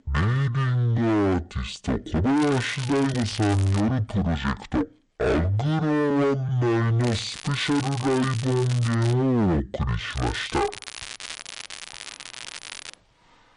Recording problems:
distortion; heavy; 21% of the sound clipped
wrong speed and pitch; too slow and too low; 0.5 times normal speed
crackling; noticeable; from 2.5 to 4 s, from 7 to 9 s and from 10 to 13 s; 10 dB below the speech
uneven, jittery; strongly; from 1 to 11 s

